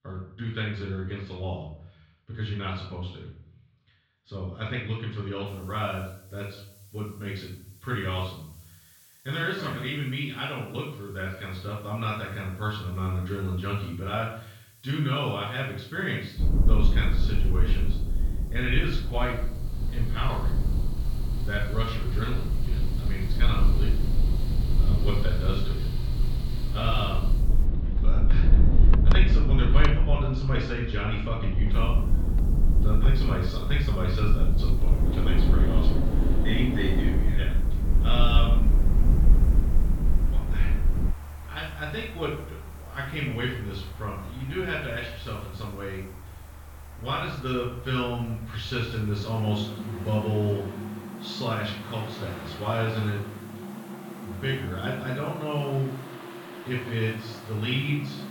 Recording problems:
off-mic speech; far
room echo; noticeable; dies away in 0.6 s
muffled; slightly; fading above 4 kHz
machinery noise; loud; from 20 s on; 6 dB below the speech
low rumble; loud; from 16 to 41 s; 9 dB below the speech
hiss; faint; from 5.5 to 28 s and from 32 s on; 25 dB below the speech

